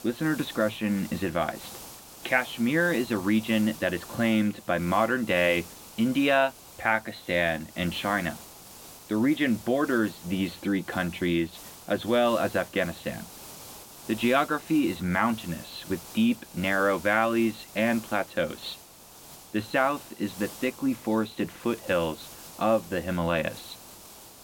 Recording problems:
high frequencies cut off; severe; nothing above 4 kHz
hiss; noticeable; throughout; 15 dB below the speech

